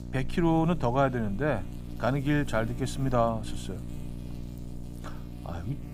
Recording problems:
electrical hum; noticeable; throughout; 60 Hz, 20 dB below the speech

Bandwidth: 15.5 kHz